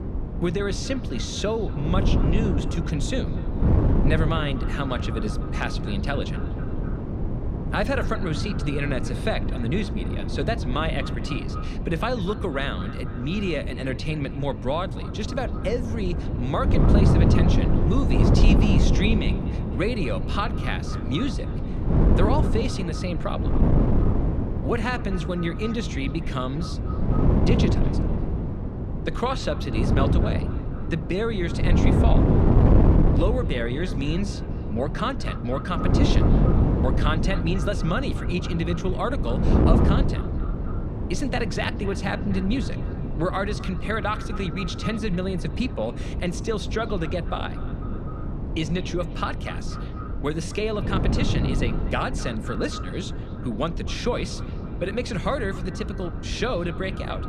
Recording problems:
echo of what is said; noticeable; throughout; 250 ms later, 15 dB below the speech
wind noise on the microphone; heavy; 4 dB below the speech

